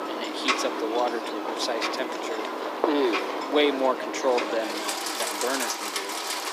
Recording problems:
thin; somewhat; fading below 300 Hz
rain or running water; loud; throughout; as loud as the speech
voice in the background; noticeable; throughout; 15 dB below the speech

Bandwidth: 15 kHz